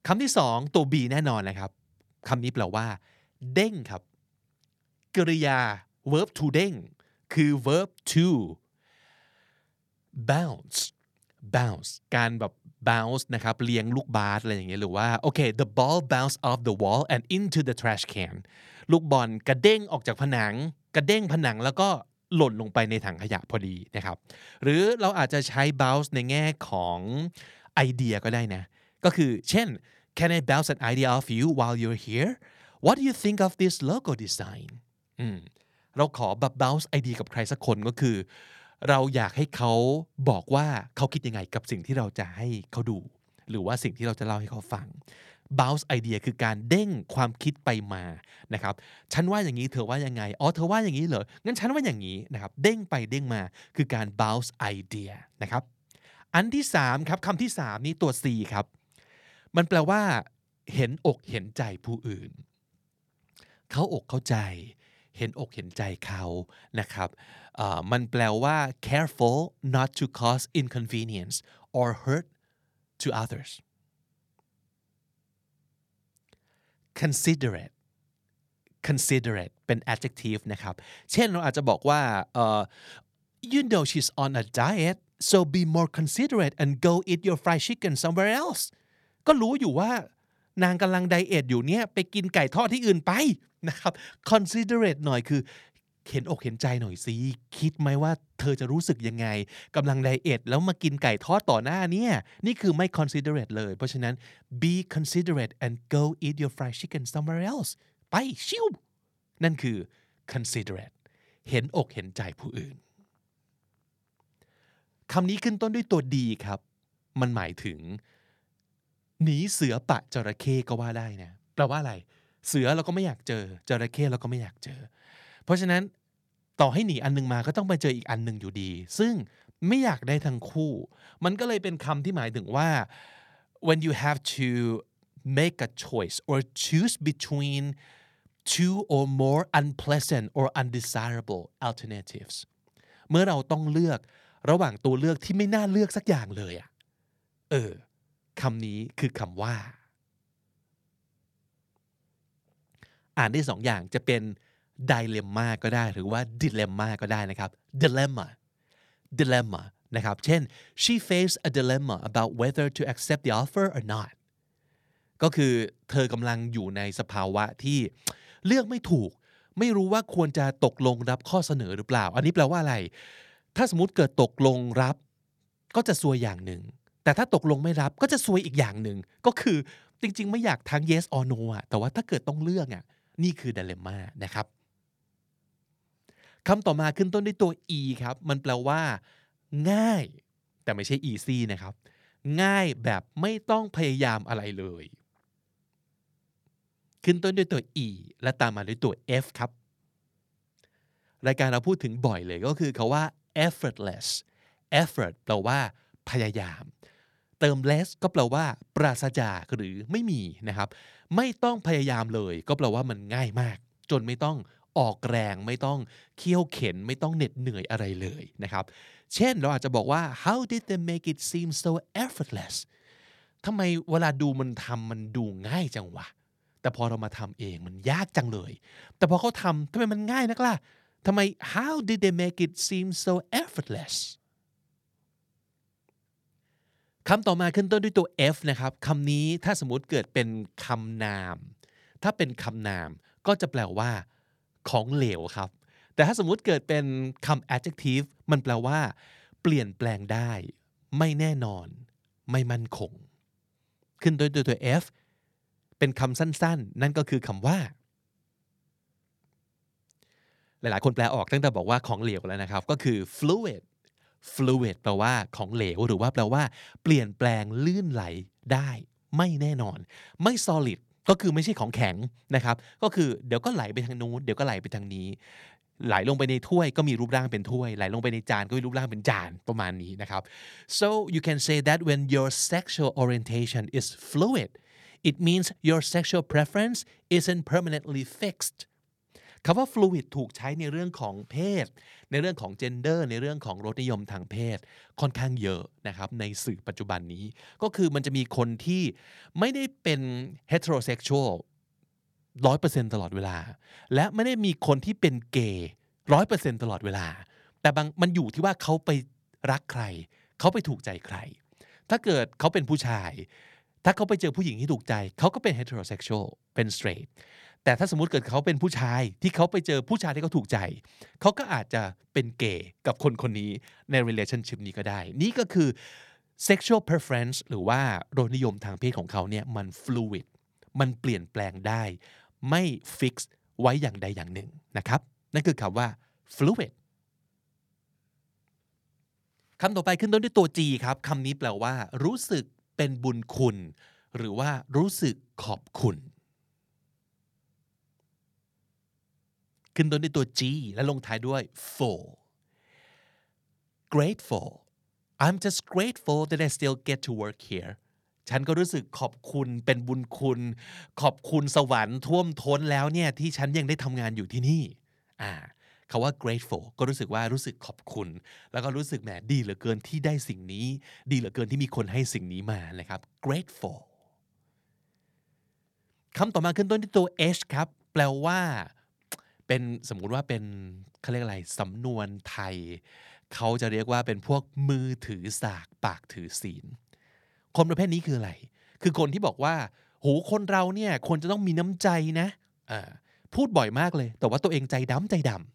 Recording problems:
uneven, jittery; strongly; from 5 s to 6:12

